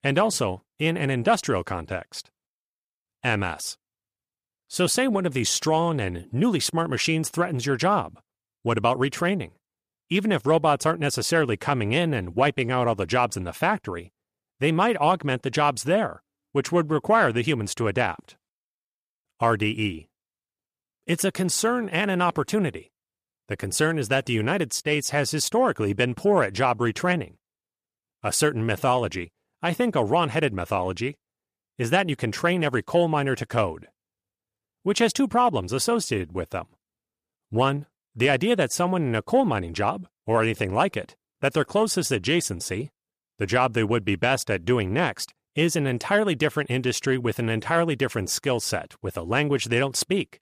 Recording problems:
none

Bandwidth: 14.5 kHz